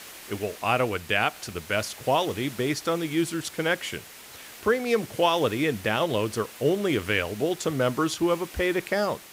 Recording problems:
hiss; noticeable; throughout; 15 dB below the speech

